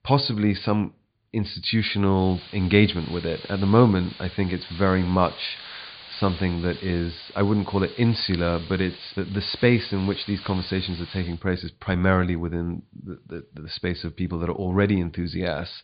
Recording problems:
high frequencies cut off; severe; nothing above 4.5 kHz
hiss; noticeable; from 2 to 11 s; 15 dB below the speech

